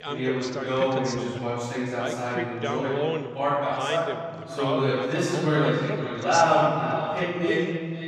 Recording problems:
echo of what is said; strong; from 4.5 s on; 510 ms later, 10 dB below the speech
room echo; strong; dies away in 1.8 s
off-mic speech; far
voice in the background; loud; throughout; 7 dB below the speech

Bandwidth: 14.5 kHz